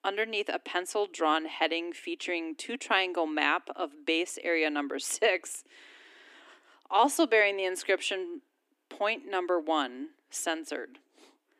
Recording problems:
thin; somewhat; fading below 250 Hz

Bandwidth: 15 kHz